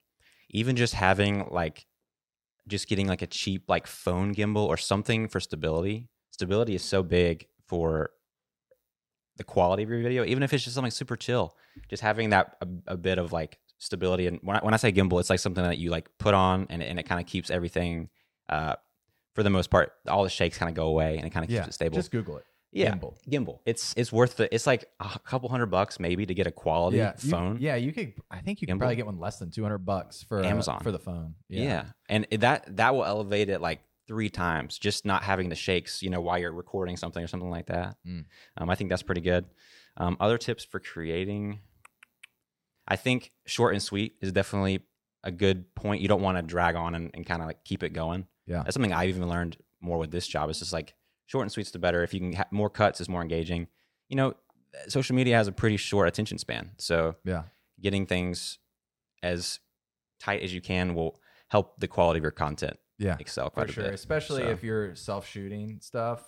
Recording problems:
none

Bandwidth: 17 kHz